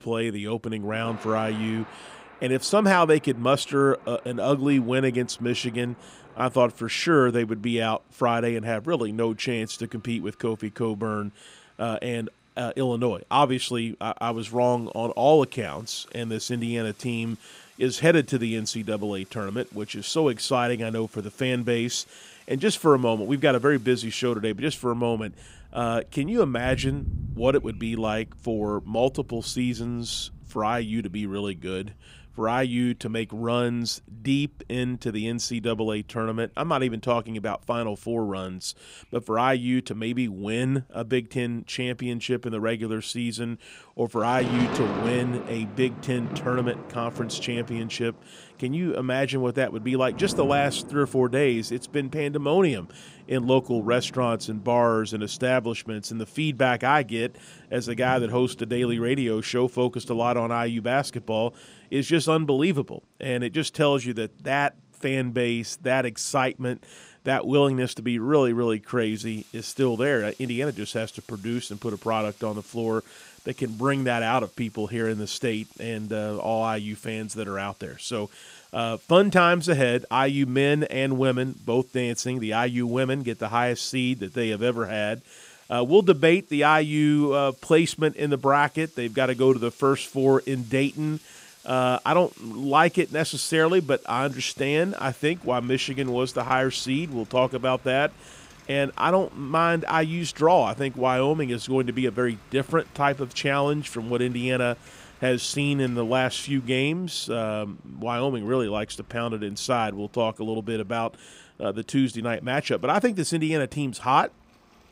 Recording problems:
rain or running water; noticeable; throughout; 20 dB below the speech

